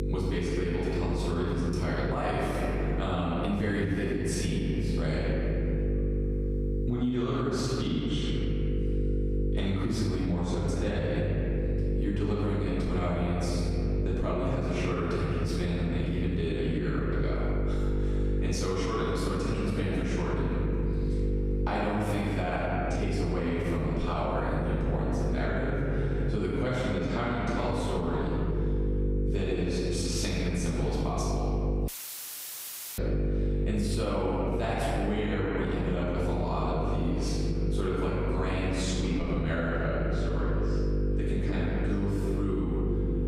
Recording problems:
room echo; strong; dies away in 2.1 s
off-mic speech; far
squashed, flat; somewhat
electrical hum; loud; throughout; 50 Hz, 7 dB below the speech
audio cutting out; filled with static; at 32 s for 1 s

